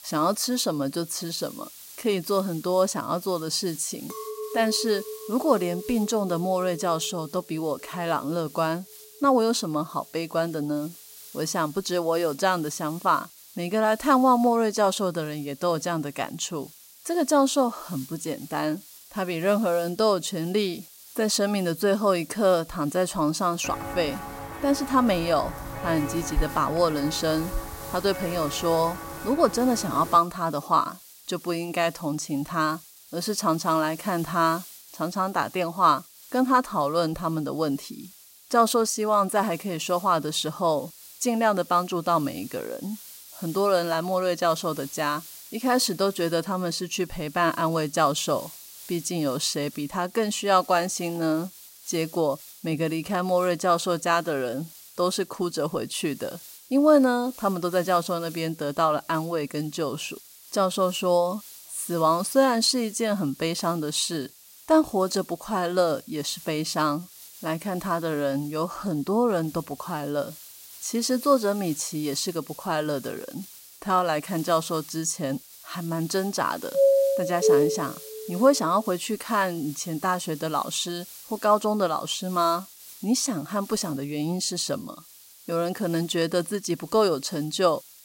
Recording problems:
hiss; noticeable; throughout; 20 dB below the speech
clattering dishes; noticeable; from 4 to 8.5 s; peak 8 dB below the speech
footsteps; noticeable; from 24 to 29 s; peak 6 dB below the speech
doorbell; loud; from 1:17 to 1:18; peak 6 dB above the speech

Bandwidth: 16 kHz